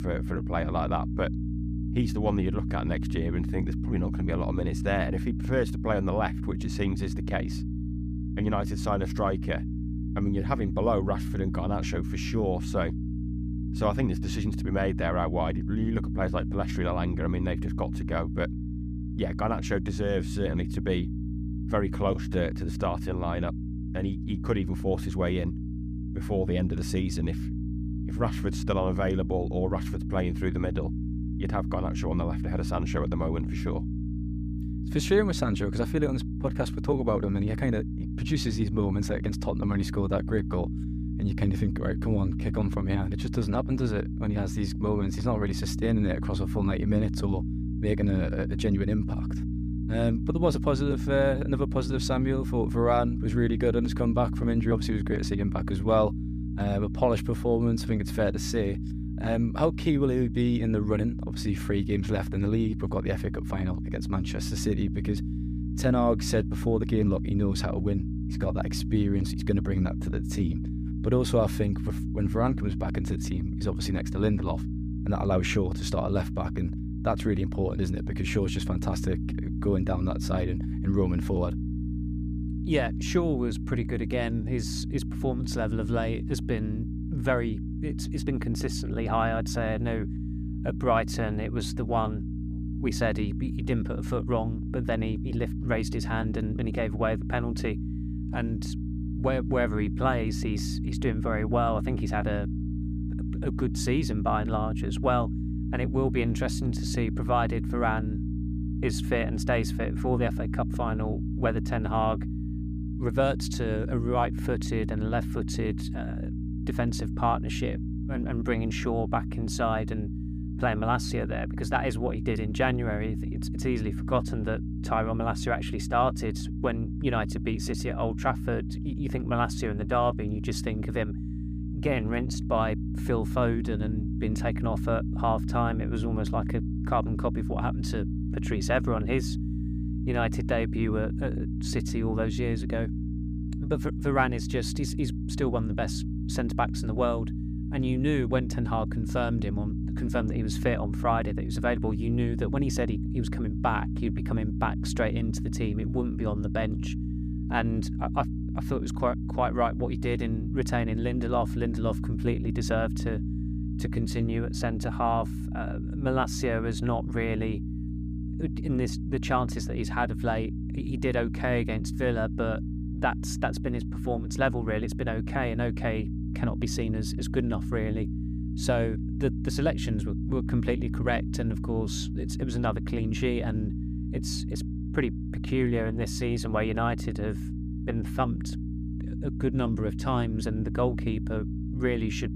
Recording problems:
electrical hum; loud; throughout; 60 Hz, 10 dB below the speech

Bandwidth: 15 kHz